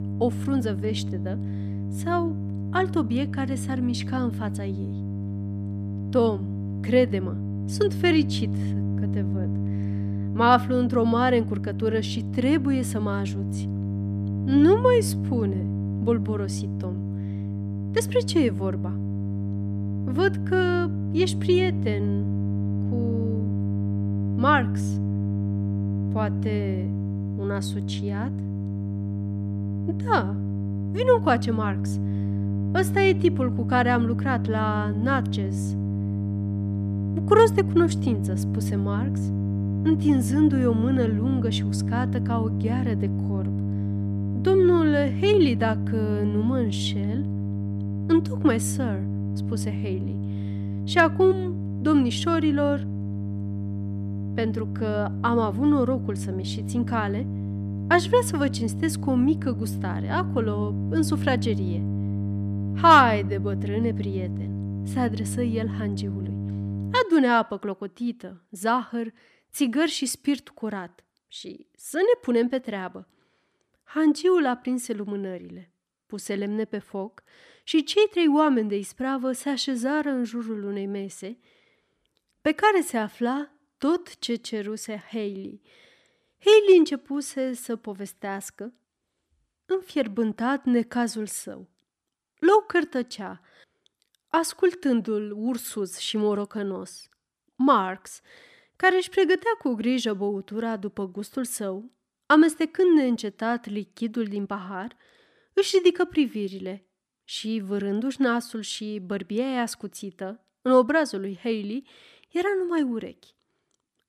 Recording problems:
electrical hum; noticeable; until 1:07; 50 Hz, 10 dB below the speech

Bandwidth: 14.5 kHz